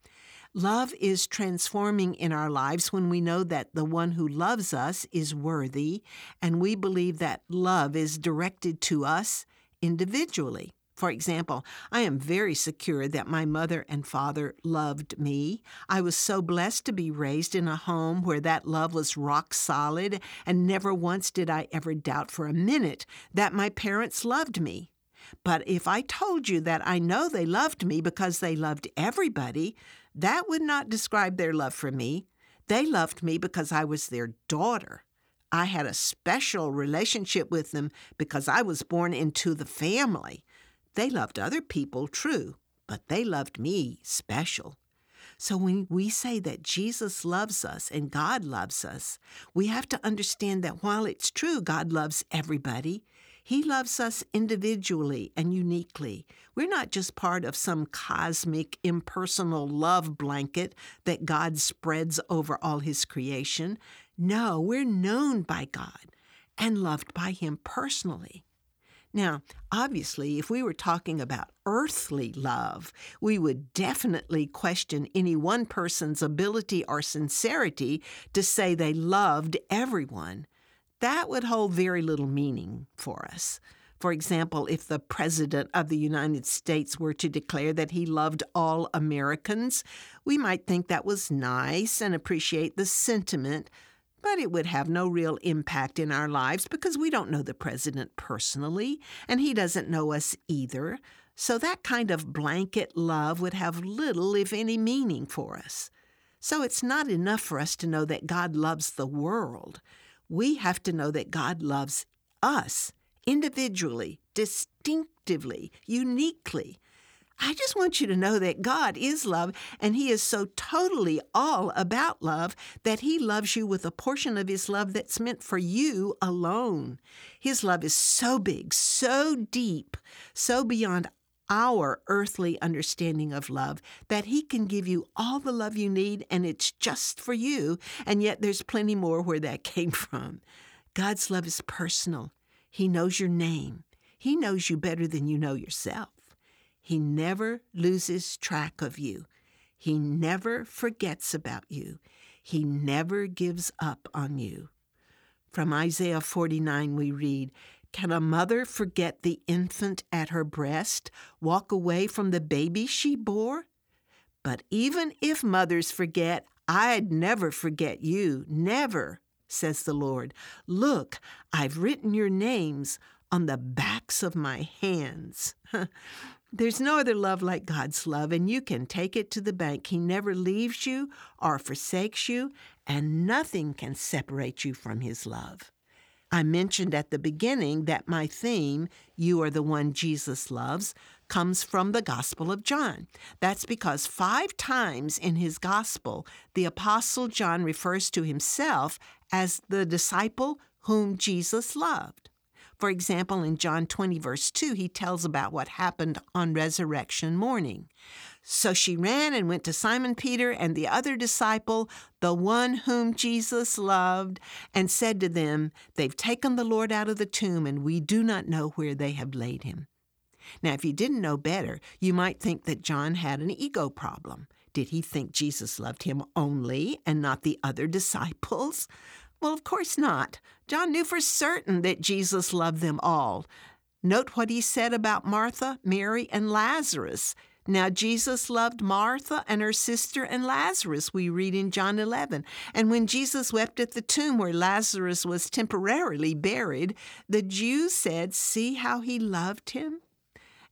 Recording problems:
none

